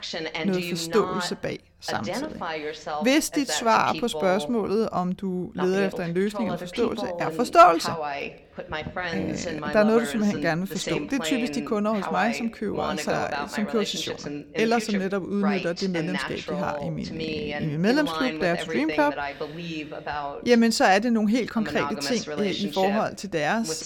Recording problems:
voice in the background; loud; throughout; 7 dB below the speech

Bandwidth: 18 kHz